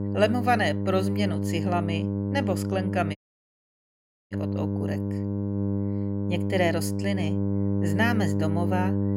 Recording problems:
electrical hum; loud; throughout; 50 Hz, 6 dB below the speech
audio cutting out; at 3 s for 1 s

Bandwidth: 16 kHz